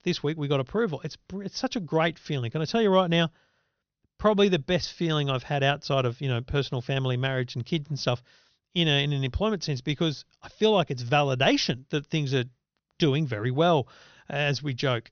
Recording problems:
high frequencies cut off; noticeable; nothing above 6.5 kHz

